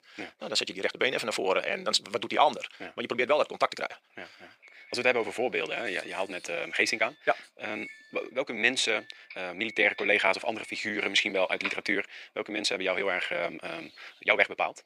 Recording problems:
thin; very; fading below 500 Hz
wrong speed, natural pitch; too fast; 1.6 times normal speed
doorbell; noticeable; from 6 to 12 s; peak 9 dB below the speech

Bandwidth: 15 kHz